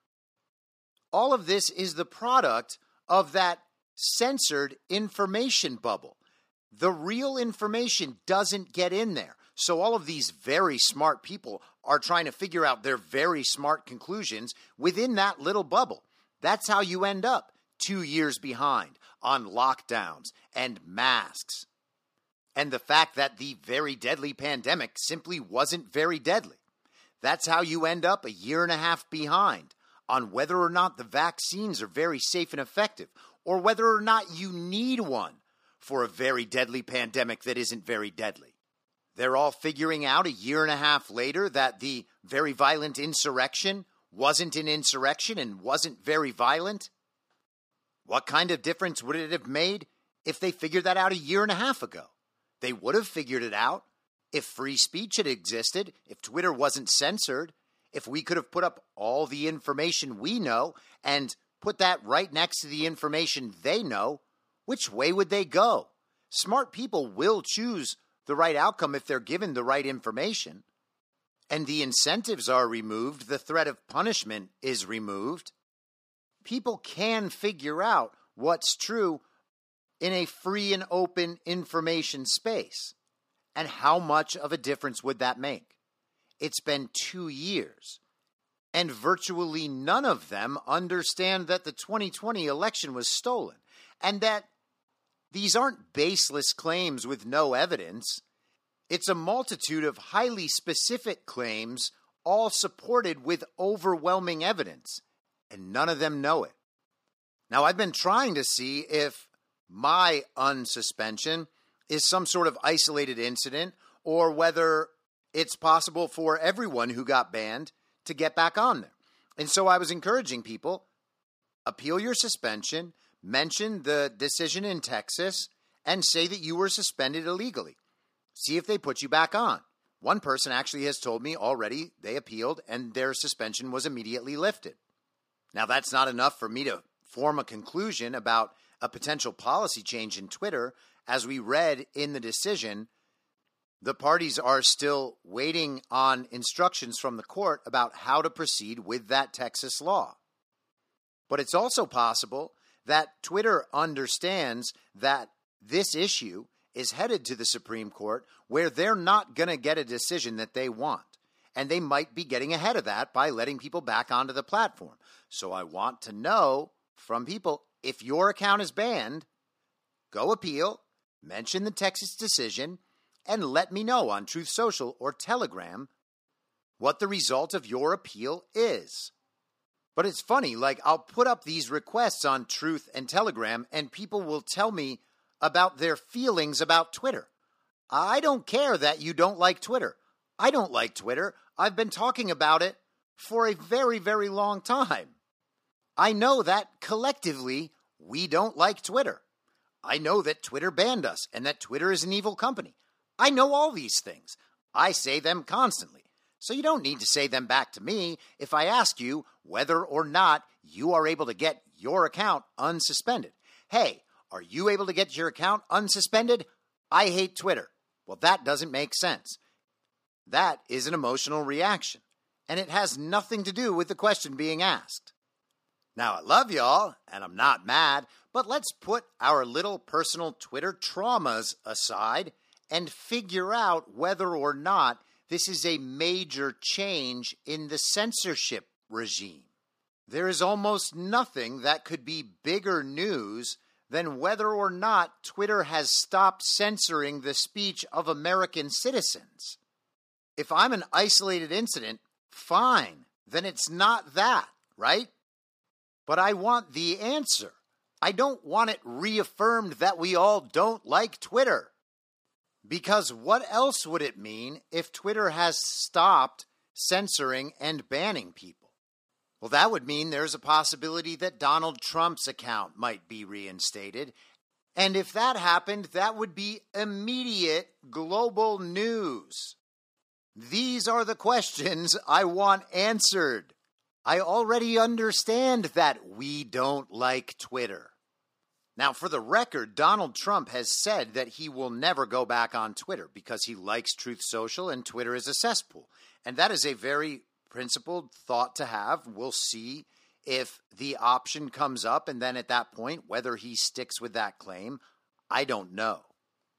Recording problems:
thin; somewhat; fading below 250 Hz

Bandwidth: 15 kHz